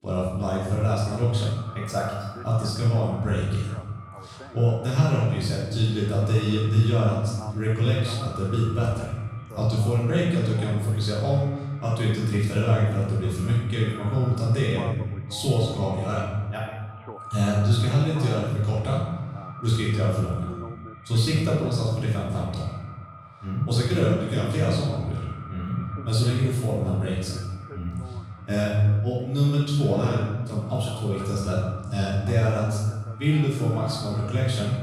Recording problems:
room echo; strong; dies away in 1.1 s
off-mic speech; far
echo of what is said; faint; throughout; 360 ms later, 20 dB below the speech
voice in the background; faint; throughout; 20 dB below the speech

